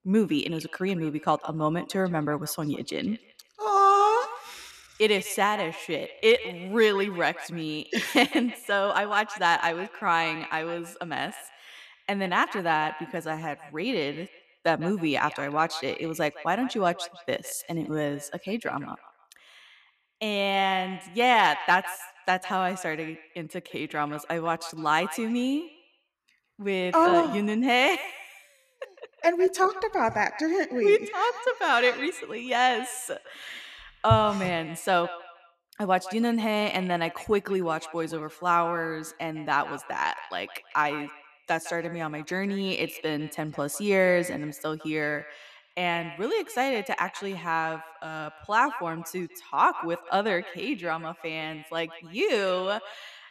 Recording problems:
echo of what is said; noticeable; throughout; 160 ms later, 15 dB below the speech

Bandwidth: 13.5 kHz